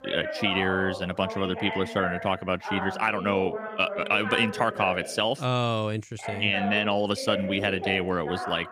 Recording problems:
voice in the background; loud; throughout; 8 dB below the speech

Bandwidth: 15 kHz